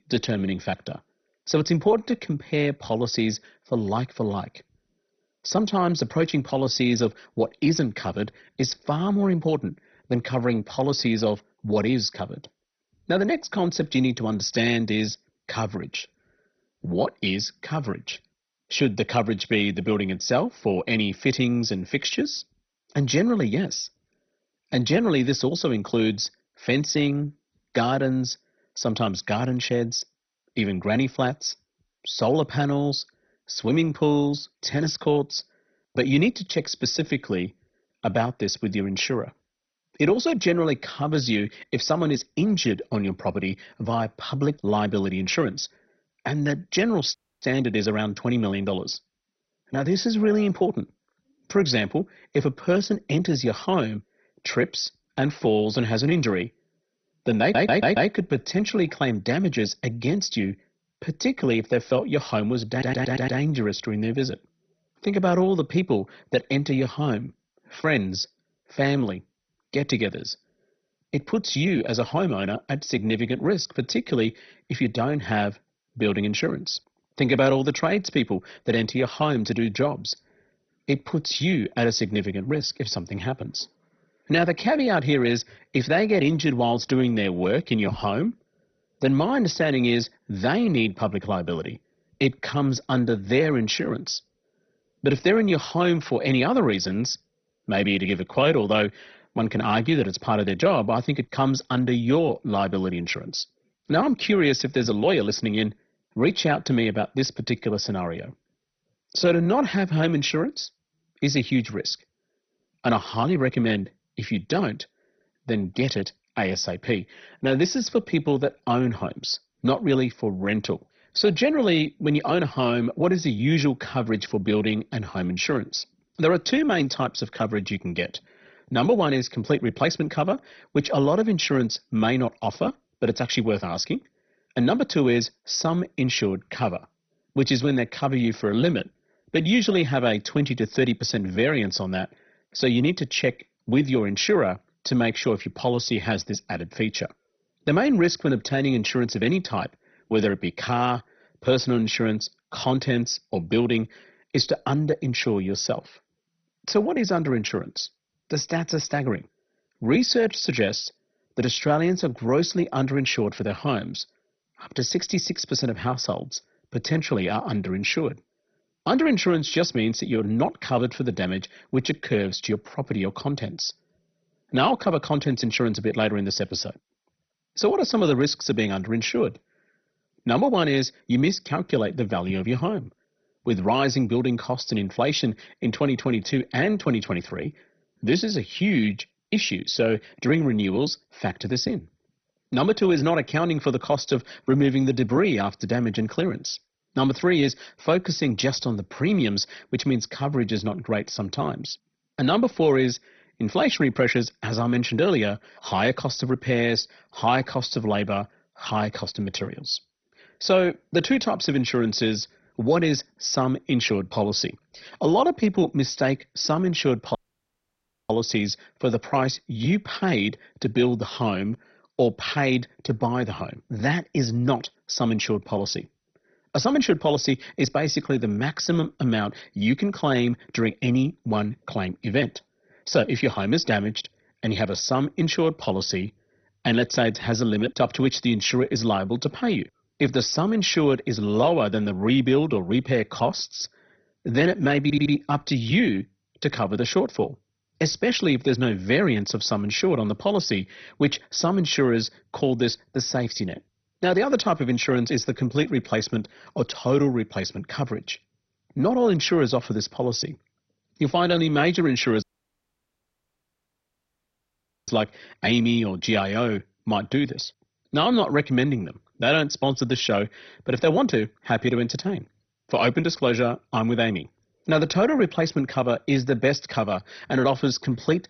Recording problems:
garbled, watery; badly; nothing above 6 kHz
audio cutting out; at 47 s, at 3:37 for 1 s and at 4:22 for 2.5 s
audio stuttering; at 57 s, at 1:03 and at 4:05

